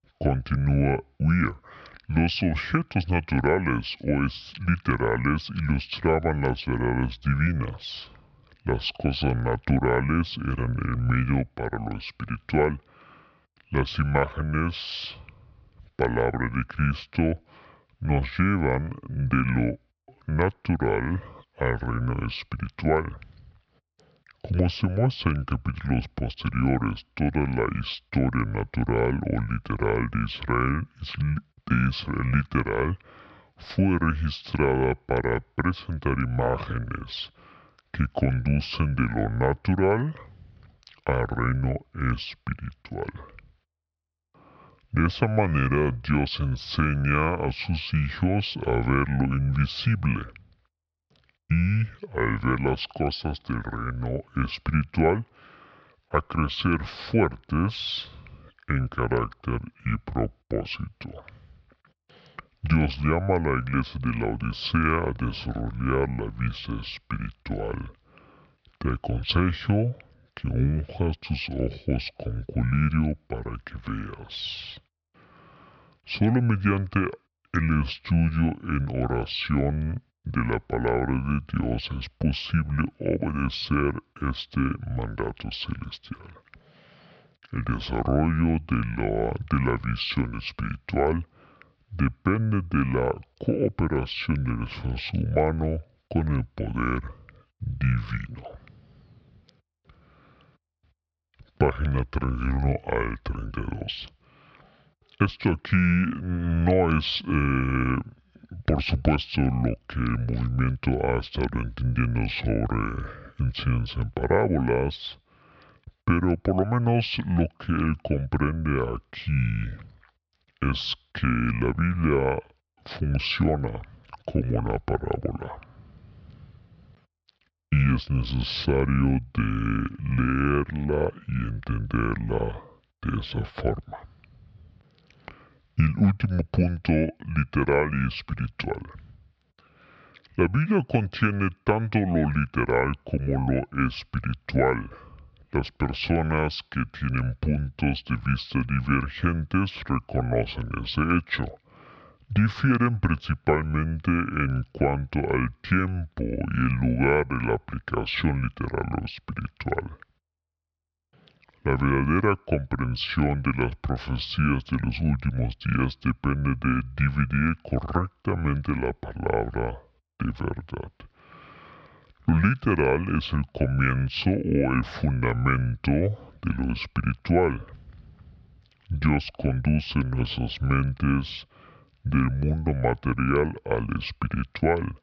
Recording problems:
wrong speed and pitch; too slow and too low; 0.7 times normal speed

